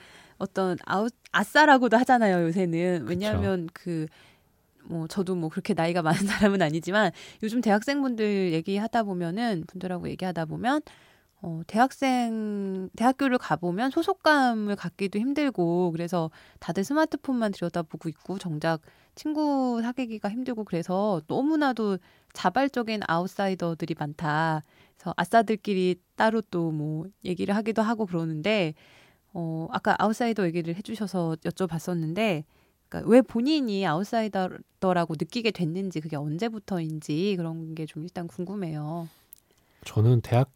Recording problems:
none

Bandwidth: 16.5 kHz